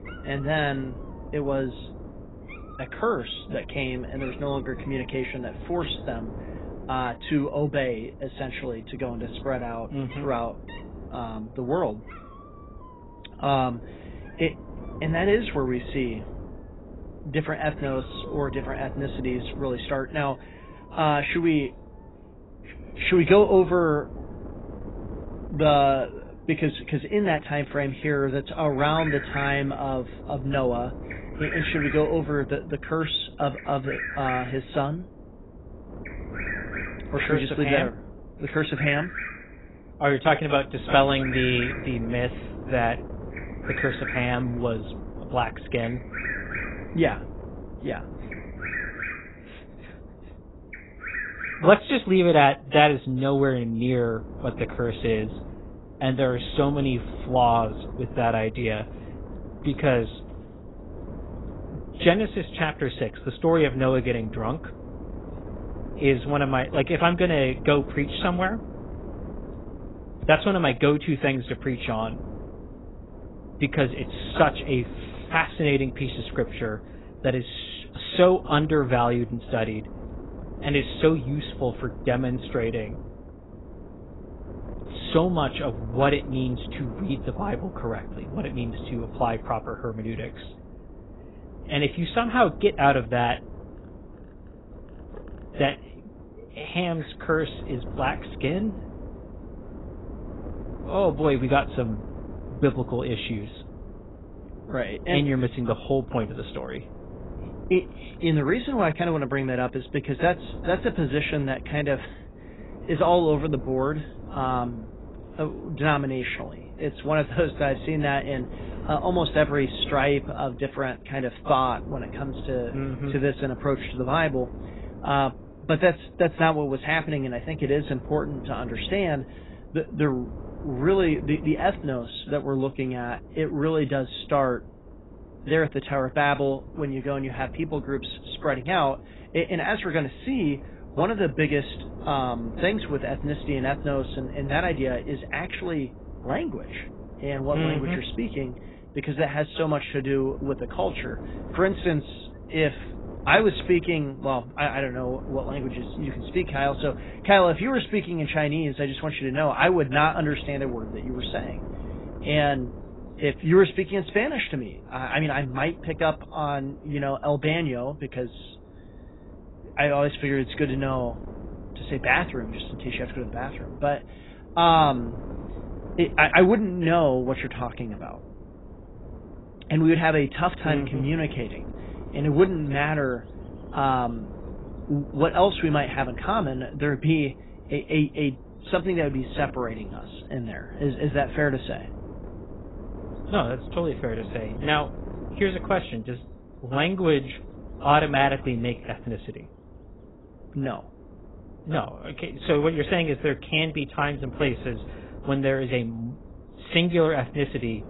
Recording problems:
garbled, watery; badly; nothing above 4 kHz
animal sounds; noticeable; throughout; 10 dB below the speech
wind noise on the microphone; occasional gusts; 20 dB below the speech

